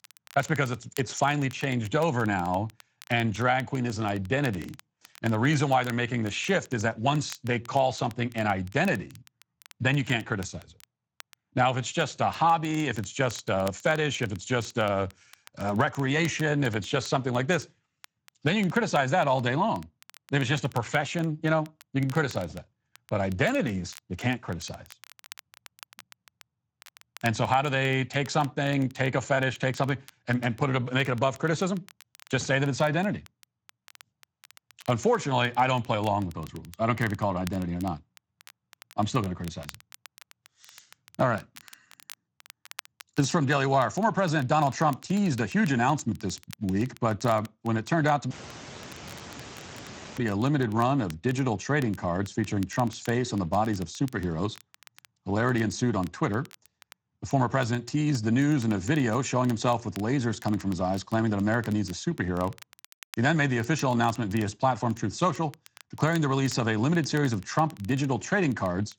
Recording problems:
garbled, watery; slightly; nothing above 7.5 kHz
crackle, like an old record; faint; 25 dB below the speech
high-pitched whine; very faint; mostly in the pauses; 2.5 kHz, 75 dB below the speech
audio cutting out; at 48 s for 2 s

